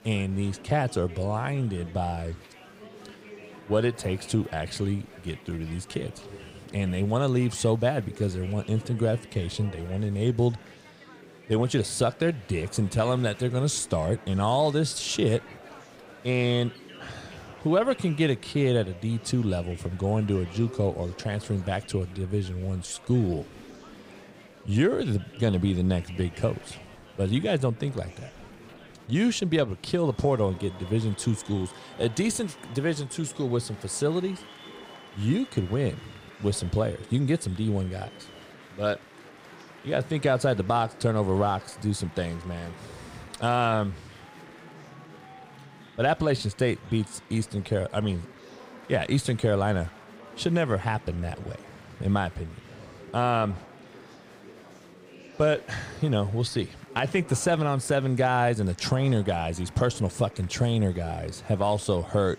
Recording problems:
murmuring crowd; noticeable; throughout; 20 dB below the speech

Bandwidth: 15.5 kHz